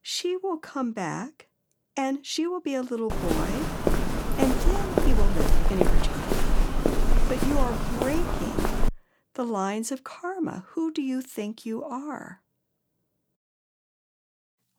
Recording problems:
uneven, jittery; strongly; from 2 to 11 s
footsteps; loud; from 3 to 9 s; peak 6 dB above the speech

